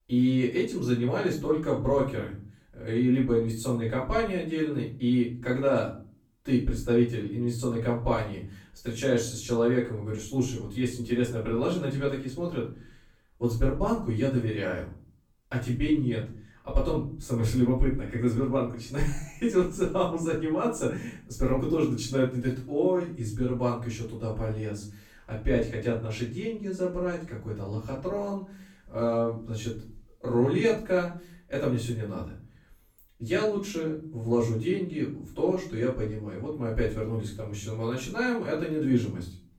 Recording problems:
off-mic speech; far
room echo; noticeable; dies away in 0.4 s

